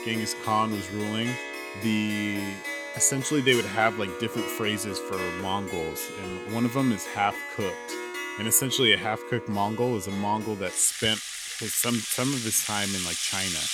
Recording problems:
background music; loud; throughout; 7 dB below the speech

